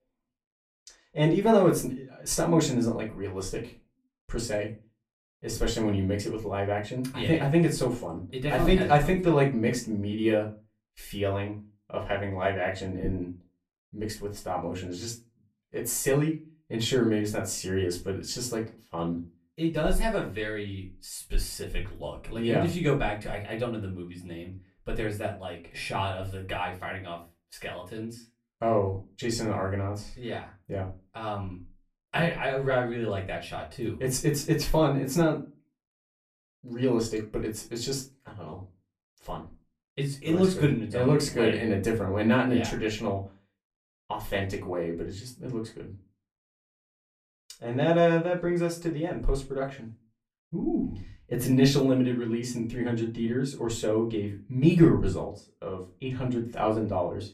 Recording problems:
off-mic speech; far
room echo; very slight; dies away in 0.2 s

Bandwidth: 14.5 kHz